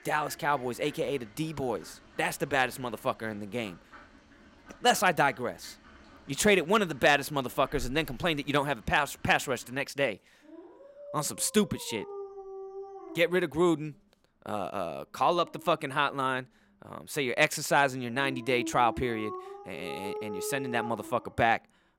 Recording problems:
animal sounds; noticeable; throughout; 15 dB below the speech

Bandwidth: 16 kHz